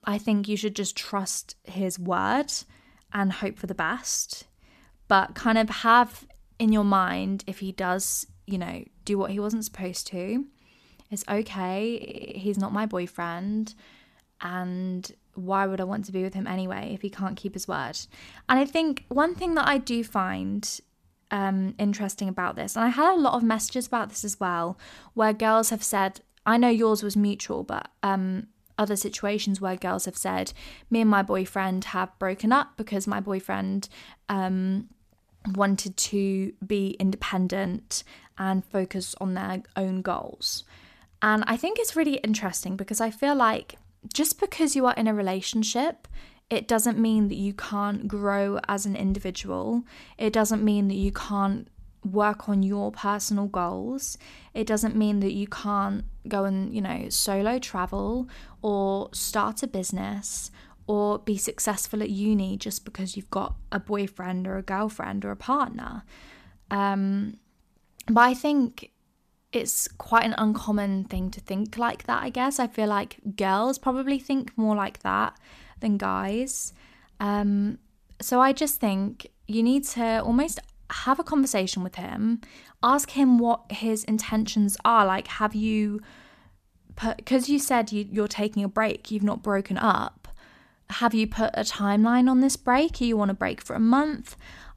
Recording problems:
audio stuttering; at 12 s

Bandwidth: 14.5 kHz